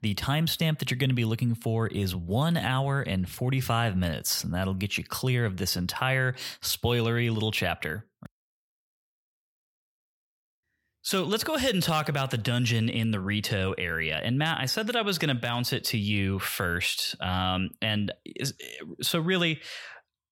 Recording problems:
none

